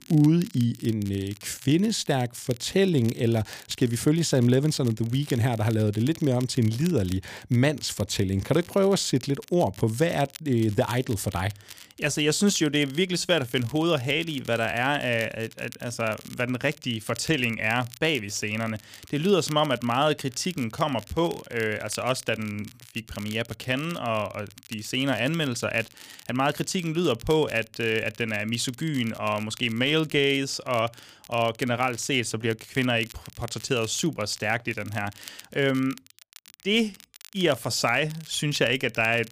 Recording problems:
crackle, like an old record; faint; 20 dB below the speech

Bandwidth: 15 kHz